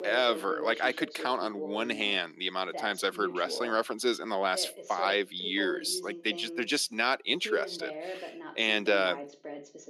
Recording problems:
thin; somewhat; fading below 250 Hz
voice in the background; noticeable; throughout; 10 dB below the speech

